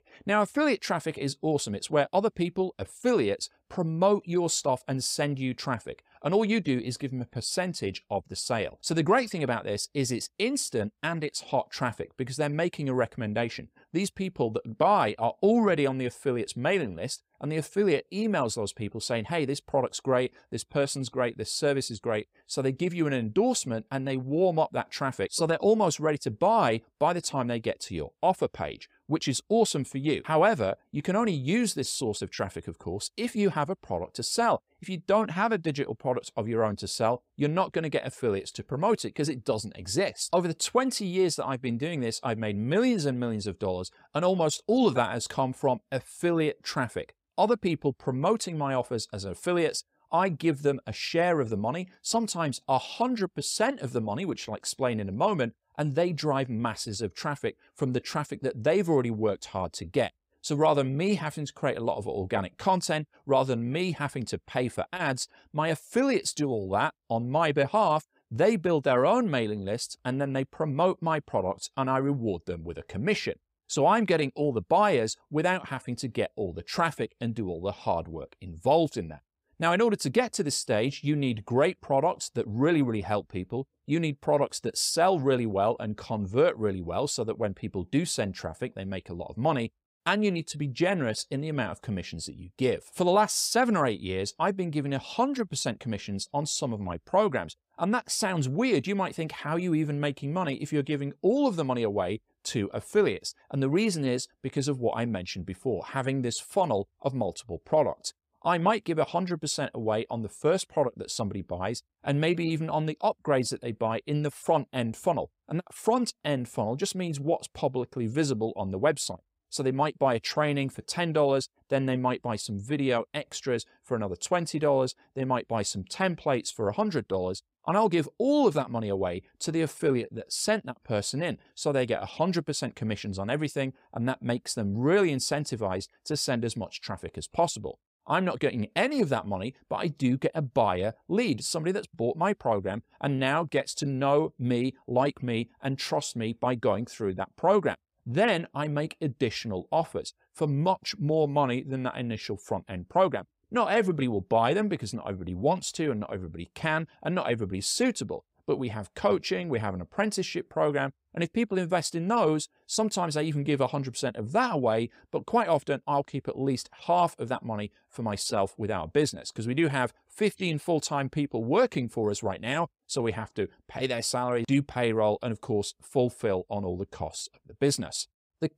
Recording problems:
none

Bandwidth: 15.5 kHz